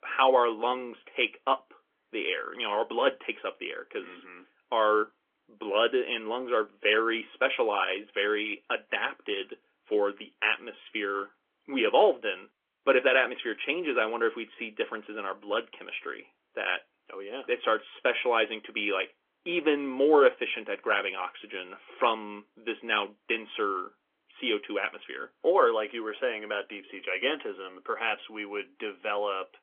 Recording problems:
phone-call audio; nothing above 3.5 kHz
garbled, watery; slightly

